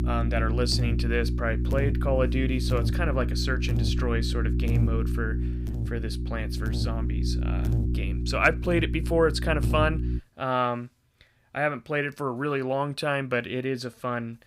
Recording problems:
electrical hum; noticeable; until 10 s; 60 Hz, 10 dB below the speech

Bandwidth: 15.5 kHz